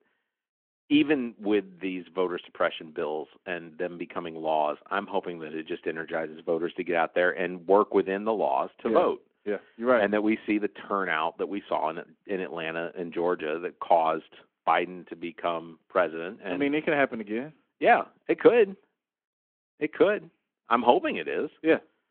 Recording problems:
phone-call audio

